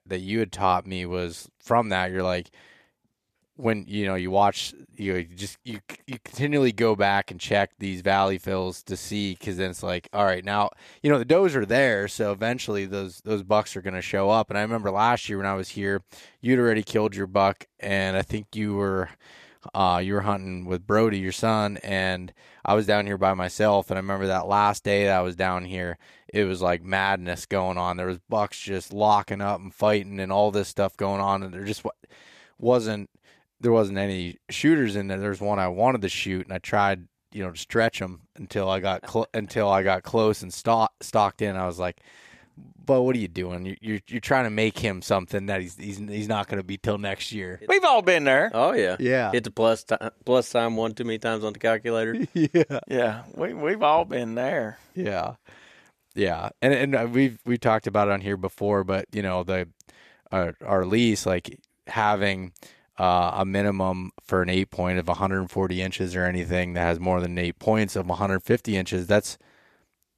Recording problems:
none

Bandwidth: 14.5 kHz